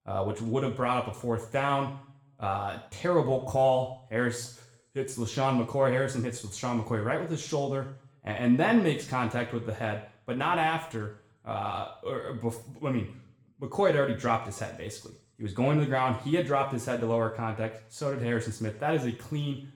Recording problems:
room echo; slight; dies away in 0.6 s
off-mic speech; somewhat distant

